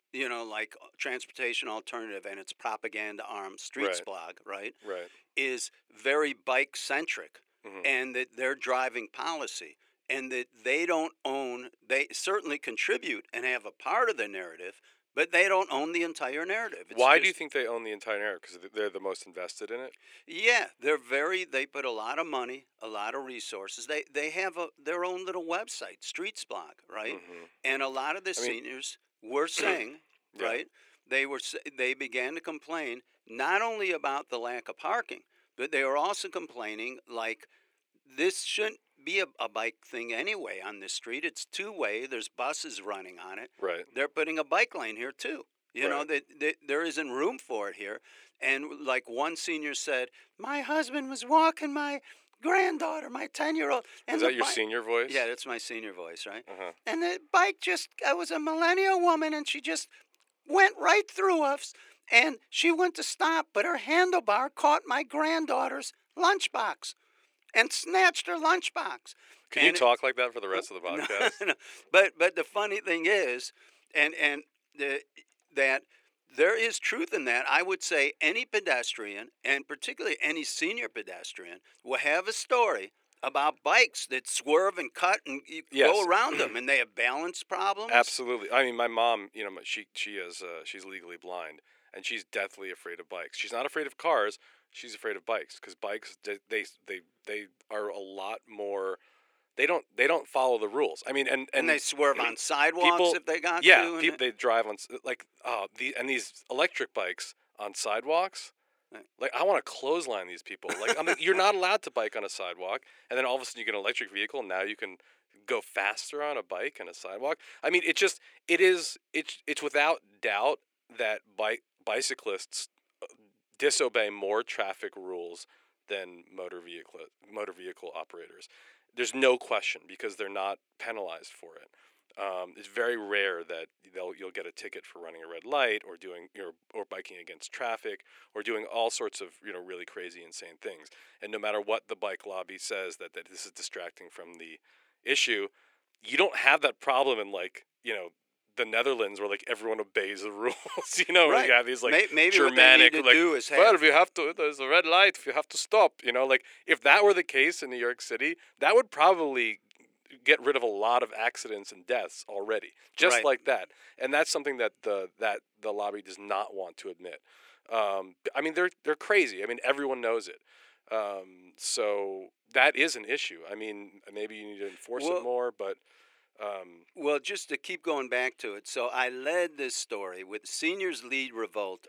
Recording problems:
thin; very; fading below 400 Hz

